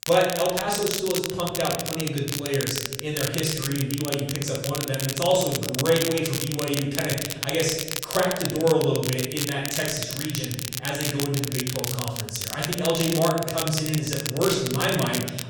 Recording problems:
off-mic speech; far
room echo; noticeable; dies away in 0.9 s
crackle, like an old record; loud; 4 dB below the speech

